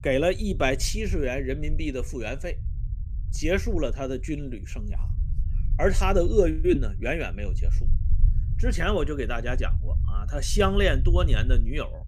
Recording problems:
low rumble; faint; throughout; 20 dB below the speech

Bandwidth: 15 kHz